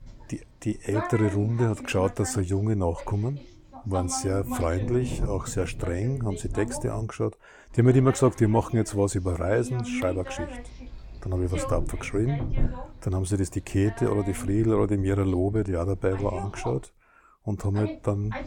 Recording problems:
voice in the background; noticeable; throughout; 10 dB below the speech

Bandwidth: 17 kHz